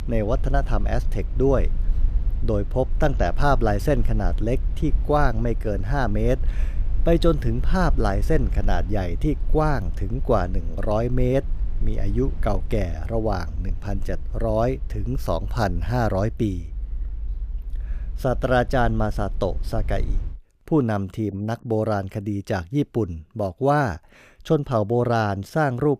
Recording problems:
low rumble; faint; until 20 s; 25 dB below the speech

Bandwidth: 14.5 kHz